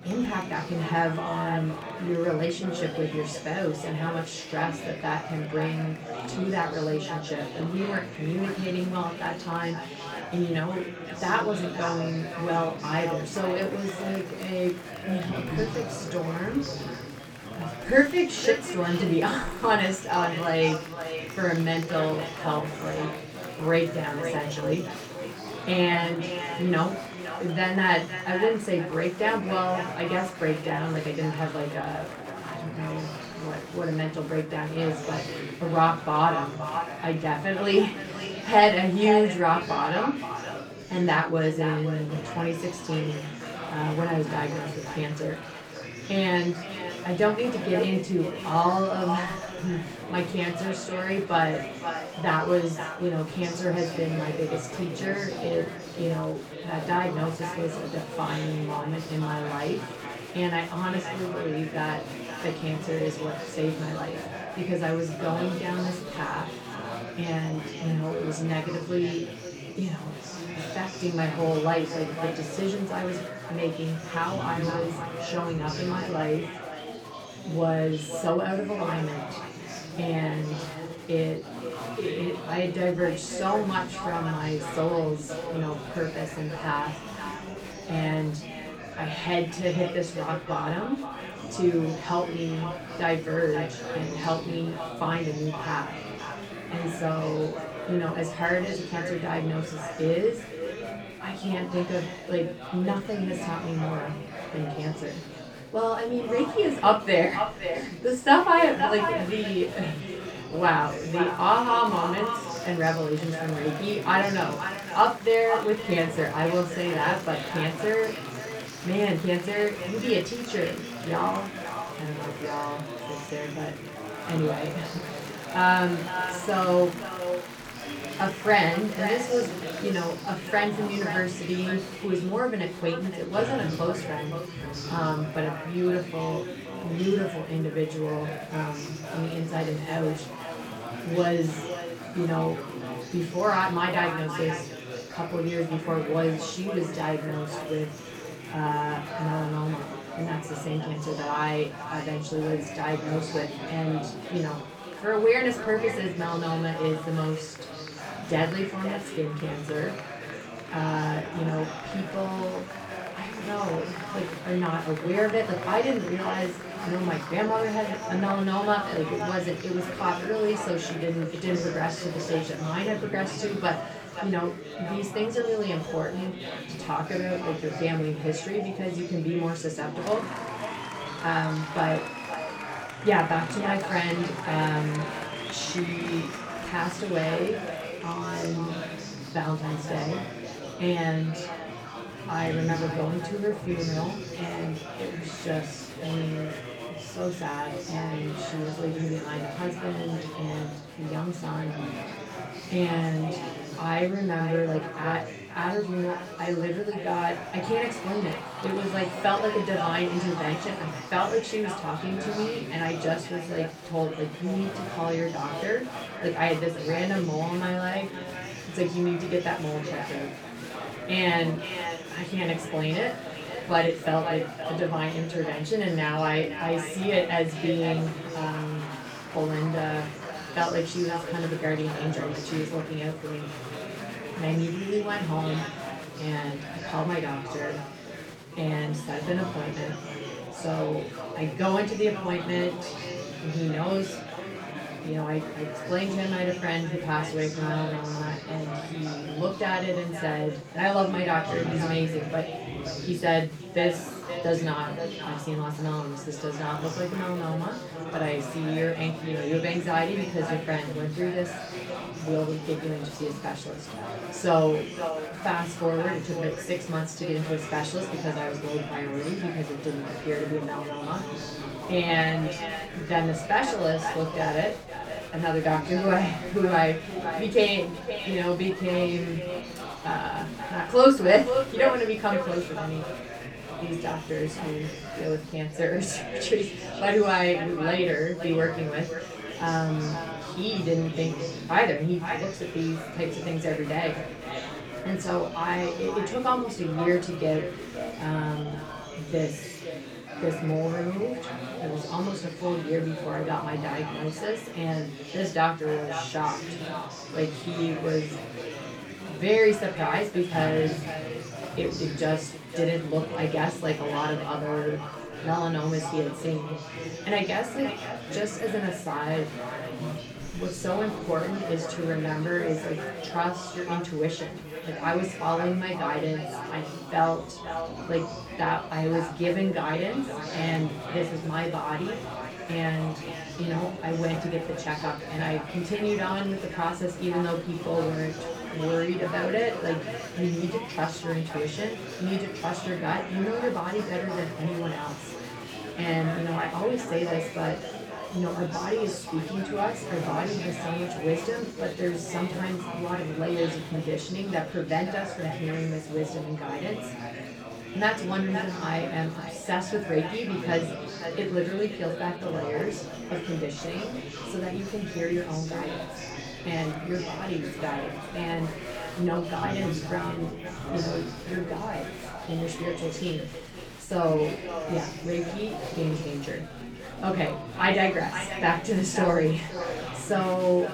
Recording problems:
echo of what is said; strong; throughout; 520 ms later, 10 dB below the speech
off-mic speech; far
room echo; slight; dies away in 0.3 s
murmuring crowd; loud; throughout; 10 dB below the speech
crackling; faint; from 23 to 26 s and at 4:17; 30 dB below the speech

